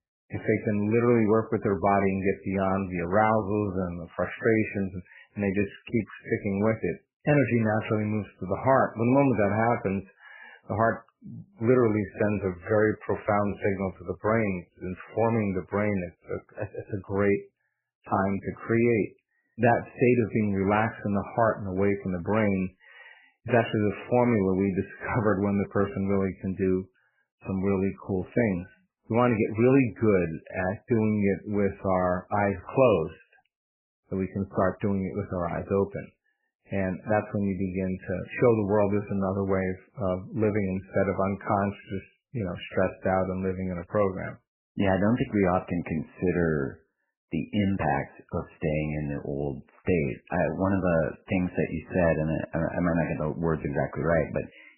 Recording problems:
garbled, watery; badly; nothing above 3 kHz

